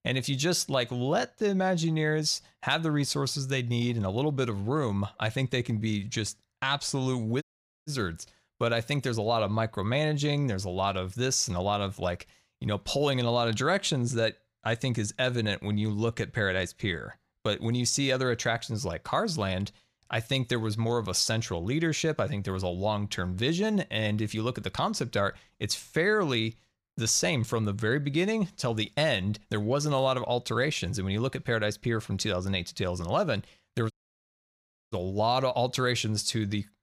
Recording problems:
audio cutting out; at 7.5 s and at 34 s for 1 s

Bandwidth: 15 kHz